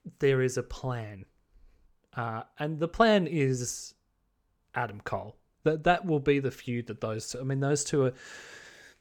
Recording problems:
none

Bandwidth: 18.5 kHz